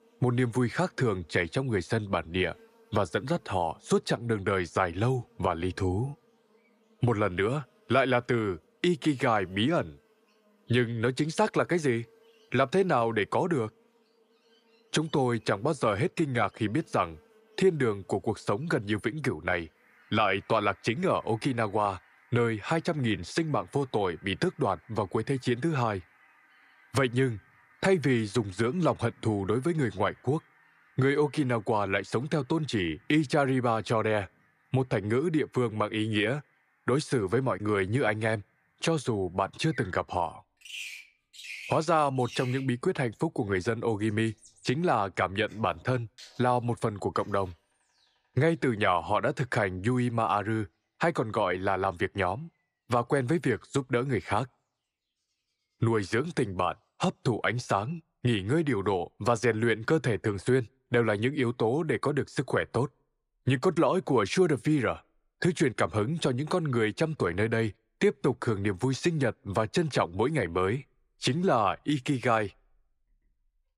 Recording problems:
animal sounds; faint; throughout; 25 dB below the speech

